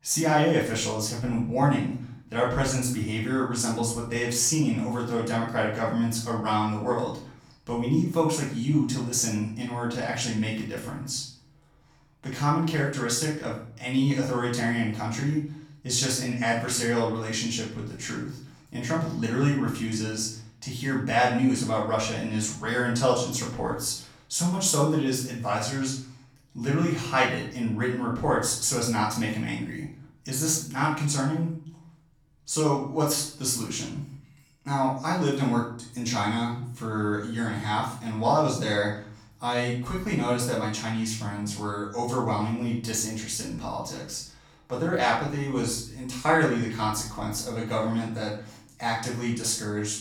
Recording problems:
off-mic speech; far
room echo; noticeable; dies away in 0.5 s

